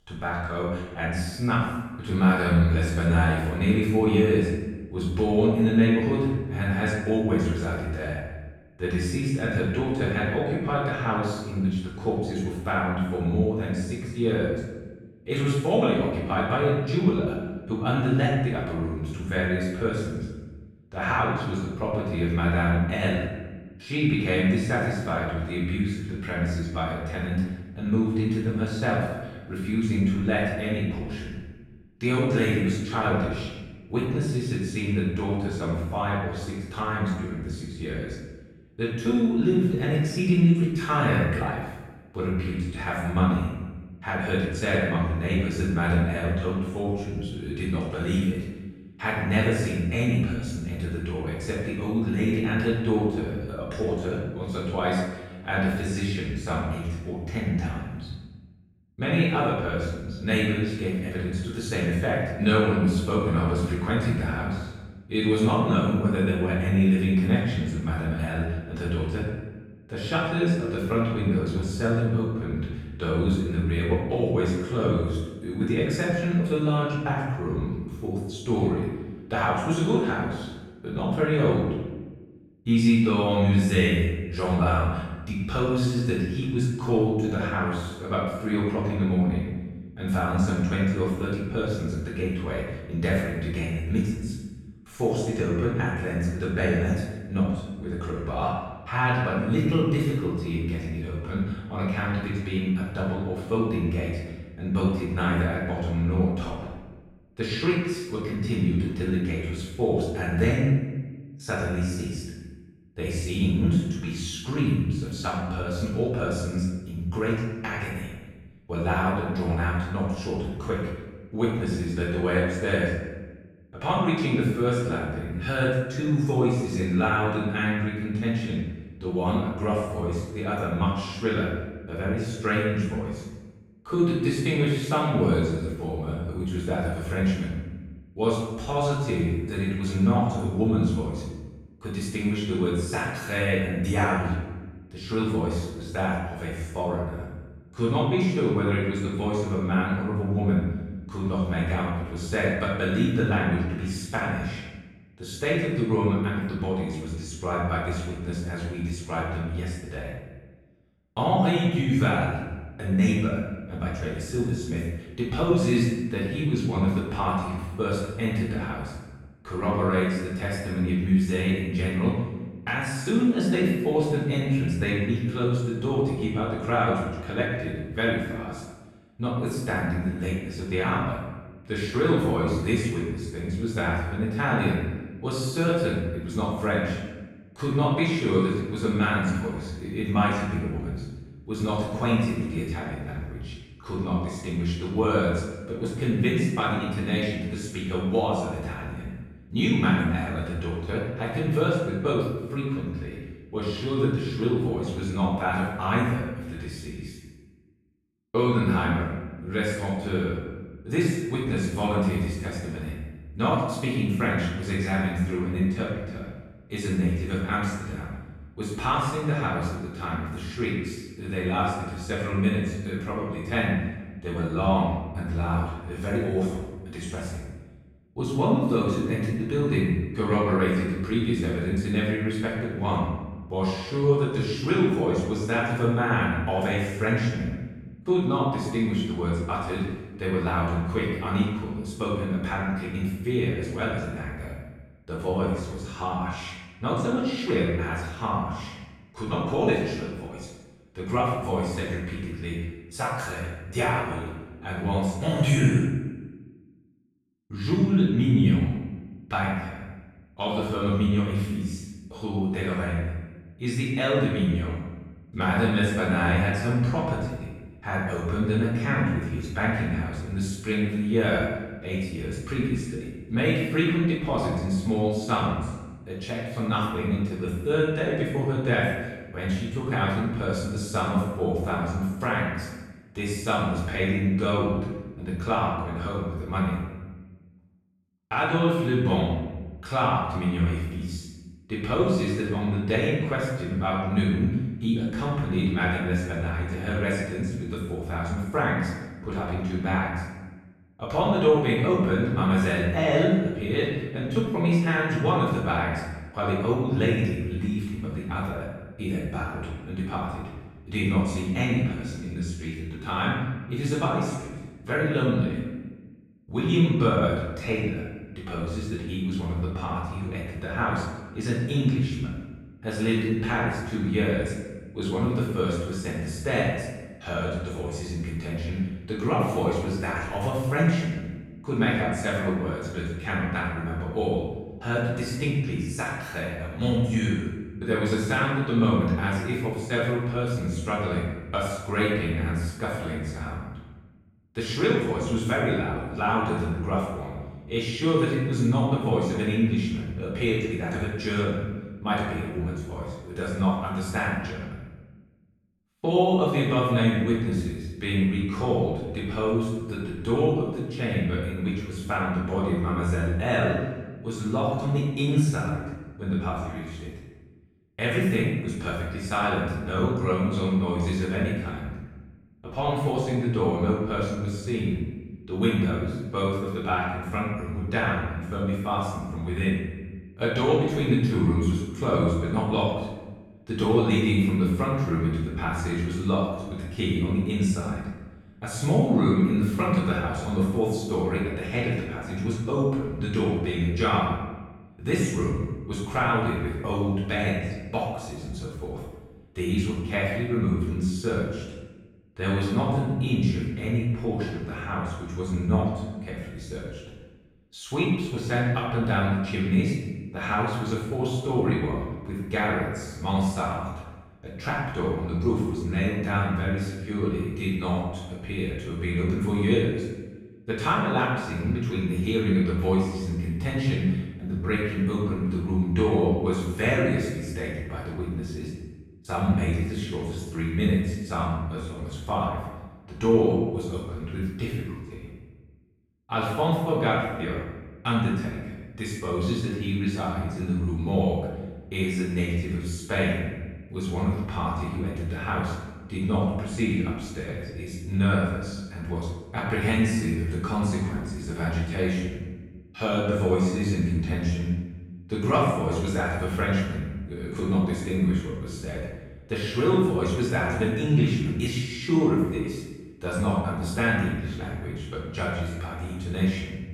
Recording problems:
room echo; strong; dies away in 1 s
off-mic speech; far

